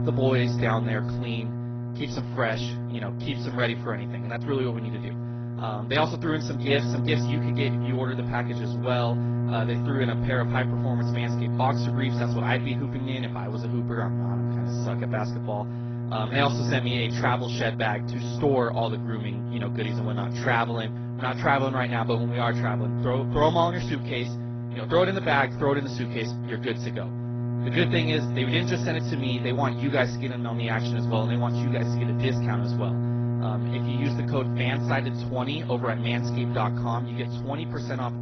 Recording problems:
garbled, watery; badly; nothing above 6 kHz
electrical hum; loud; throughout; 60 Hz, 9 dB below the speech

